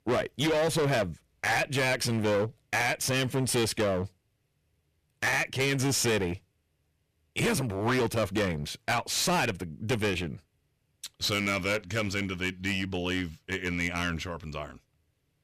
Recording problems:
distortion; heavy; 14% of the sound clipped

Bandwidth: 14.5 kHz